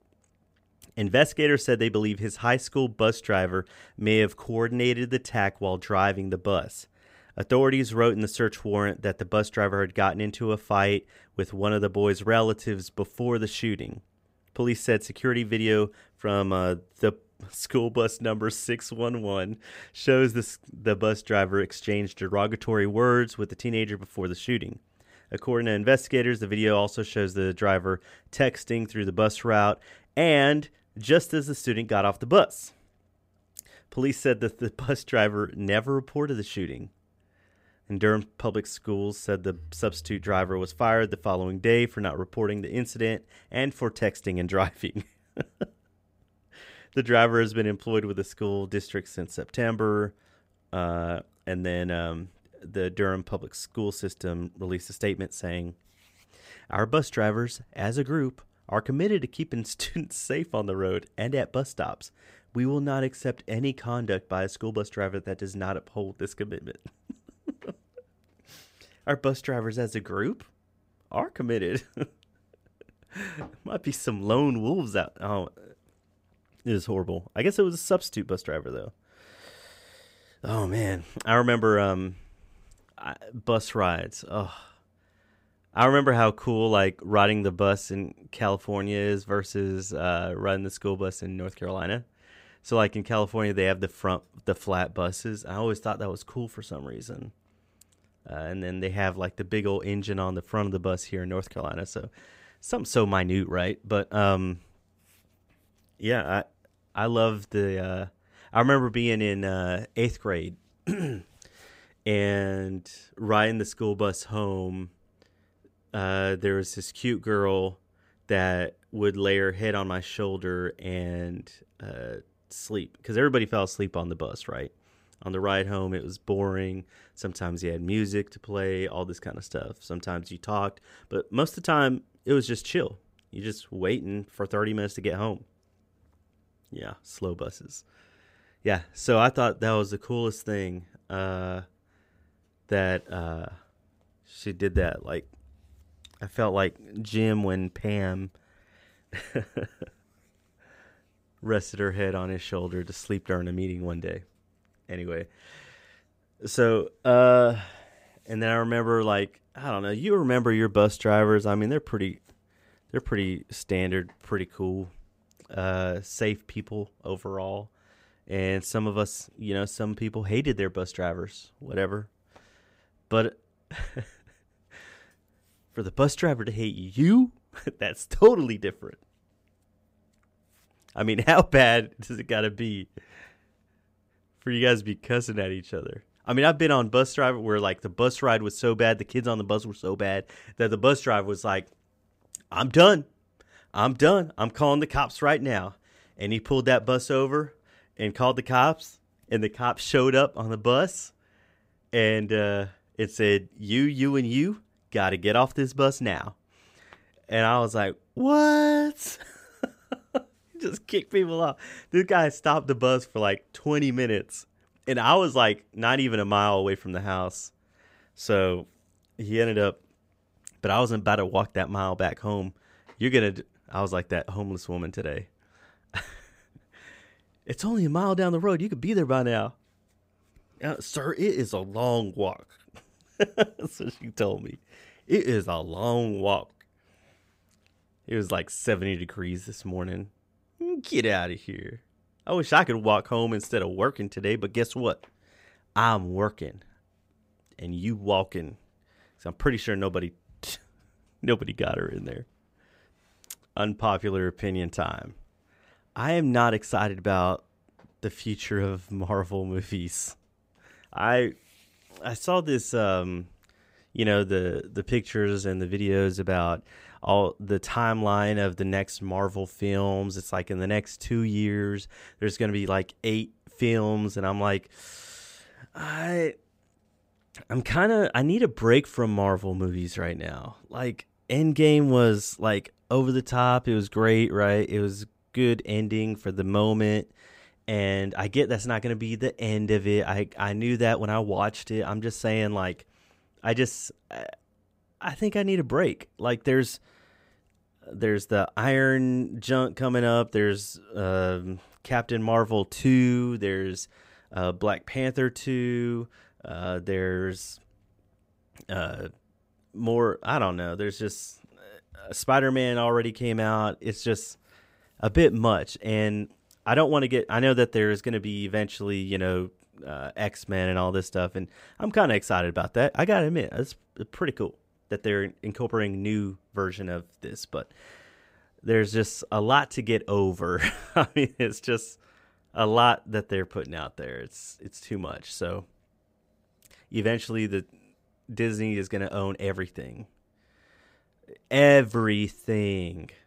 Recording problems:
none

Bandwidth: 15.5 kHz